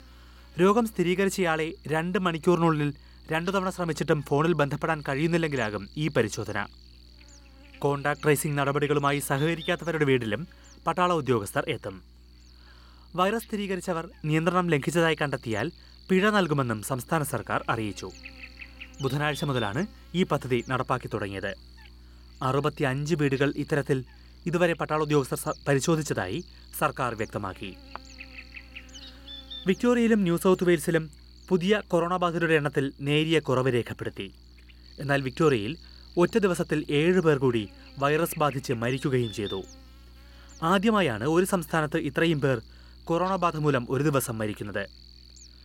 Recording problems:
electrical hum; faint; throughout; 60 Hz, 20 dB below the speech

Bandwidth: 16.5 kHz